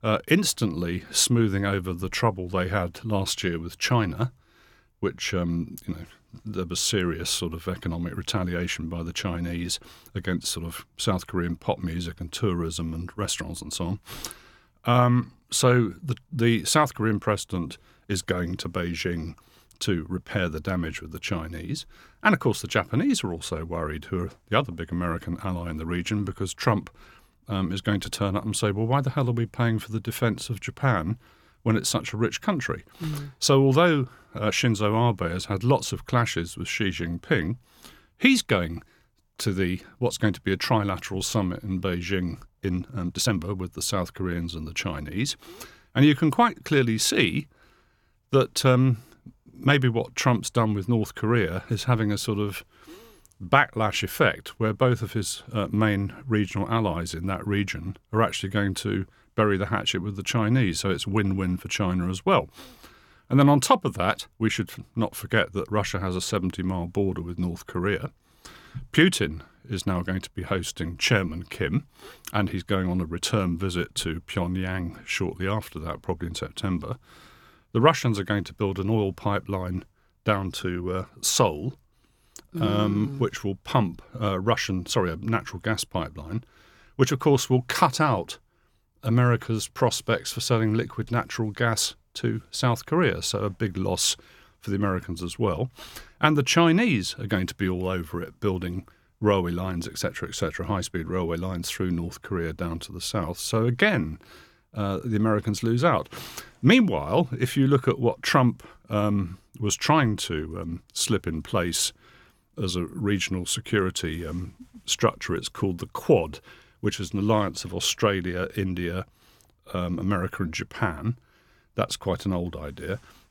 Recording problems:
uneven, jittery; strongly; from 42 s to 1:44

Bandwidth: 17 kHz